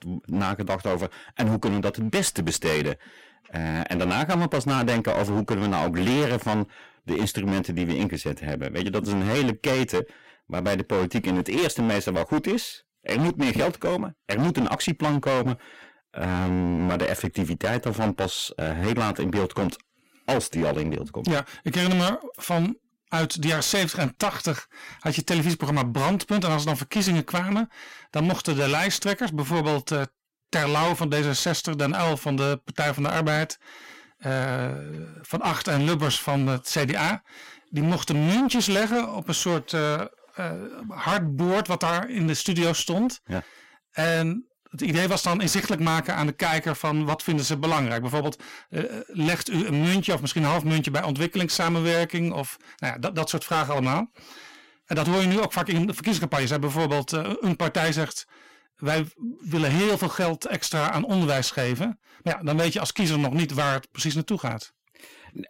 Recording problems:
distortion; heavy; 18% of the sound clipped

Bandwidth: 16 kHz